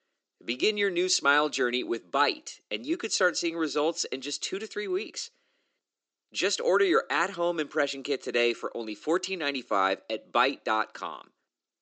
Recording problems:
thin; somewhat; fading below 300 Hz
high frequencies cut off; noticeable; nothing above 8 kHz

